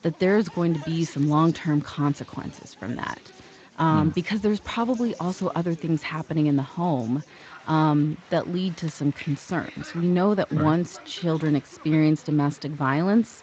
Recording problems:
garbled, watery; slightly; nothing above 7.5 kHz
crowd noise; faint; throughout; 20 dB below the speech

